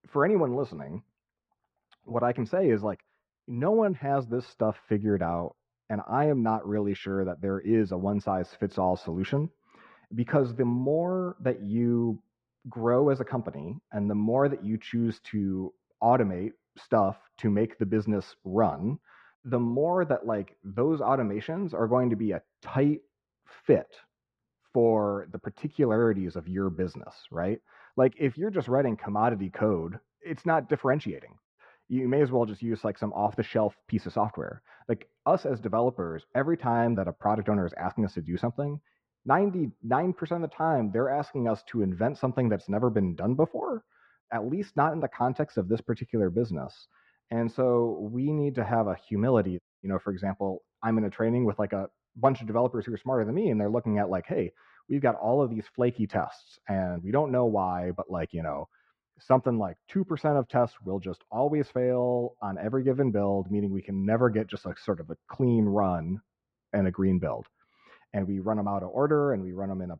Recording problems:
muffled; very; fading above 1.5 kHz

